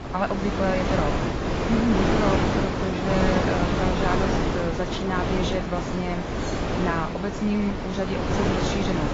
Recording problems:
garbled, watery; badly; nothing above 7.5 kHz
wind noise on the microphone; heavy; 2 dB above the speech
jangling keys; faint; at 6.5 s; peak 15 dB below the speech

